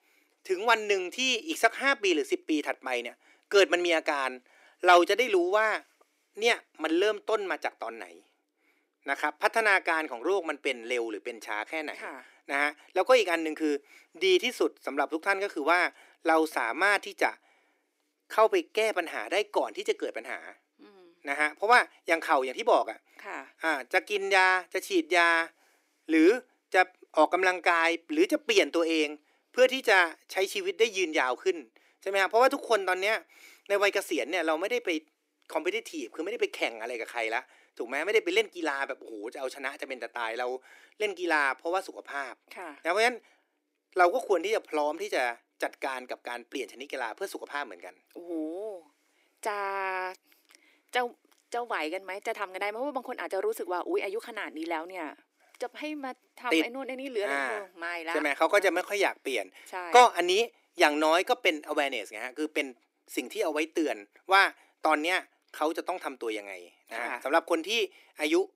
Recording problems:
thin; very; fading below 300 Hz

